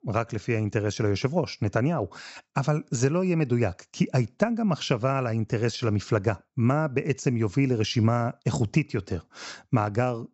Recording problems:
high frequencies cut off; noticeable; nothing above 7.5 kHz

